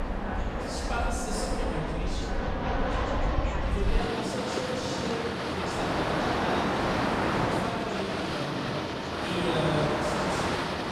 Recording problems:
echo of what is said; strong; throughout; 100 ms later, 7 dB below the speech
off-mic speech; far
room echo; noticeable; dies away in 1.4 s
train or aircraft noise; very loud; throughout; 6 dB above the speech
background chatter; loud; throughout; 2 voices, 8 dB below the speech

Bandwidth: 15 kHz